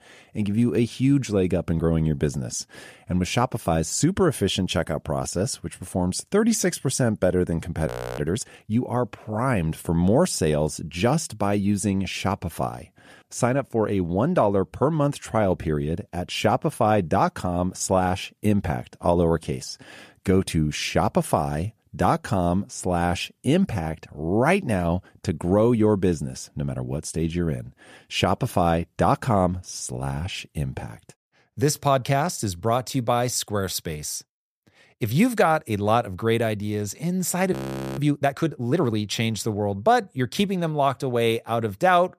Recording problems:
audio freezing; at 8 s and at 38 s

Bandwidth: 14.5 kHz